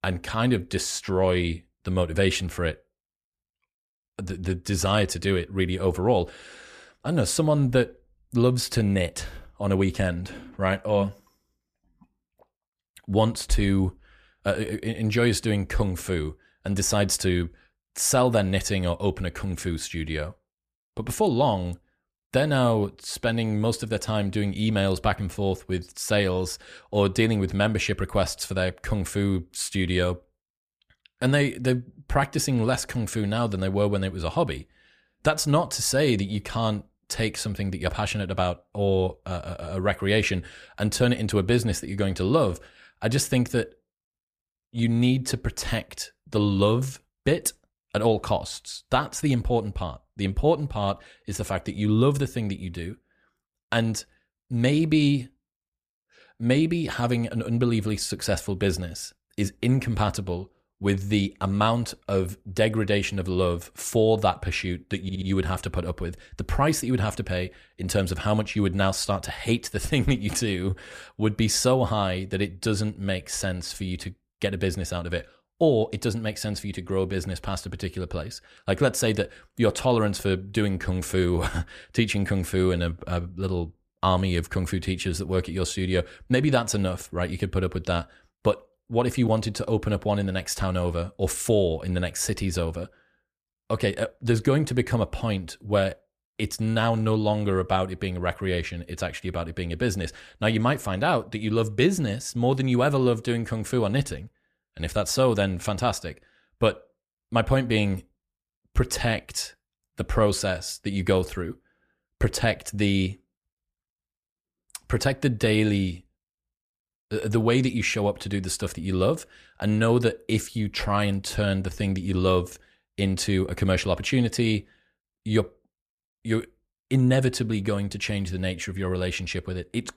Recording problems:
audio stuttering; at 1:05

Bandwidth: 14.5 kHz